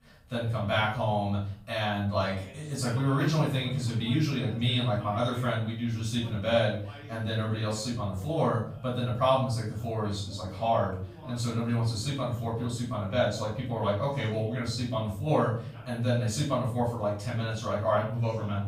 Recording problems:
off-mic speech; far
room echo; noticeable; dies away in 0.5 s
voice in the background; faint; throughout; 20 dB below the speech

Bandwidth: 15.5 kHz